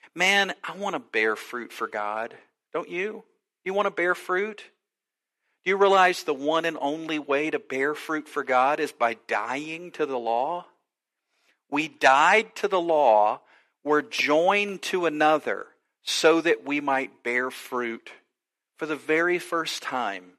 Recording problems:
thin; somewhat; fading below 400 Hz

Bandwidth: 13.5 kHz